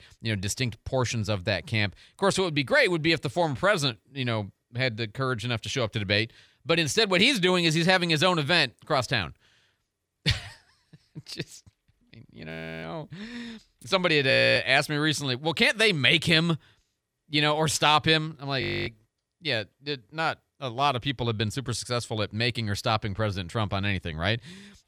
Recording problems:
audio freezing; at 12 s, at 14 s and at 19 s

